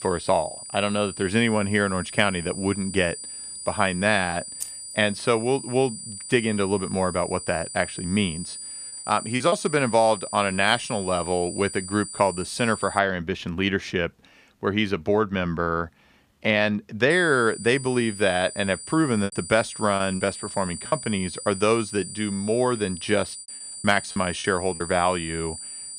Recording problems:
high-pitched whine; noticeable; until 13 s and from 17 s on; 9 kHz, 10 dB below the speech
jangling keys; faint; at 4.5 s; peak 10 dB below the speech
choppy; very; at 9.5 s, from 19 to 21 s and at 24 s; 8% of the speech affected

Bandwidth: 15 kHz